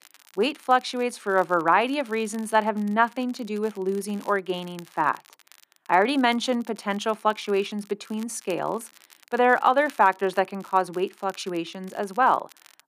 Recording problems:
crackle, like an old record; faint; 25 dB below the speech

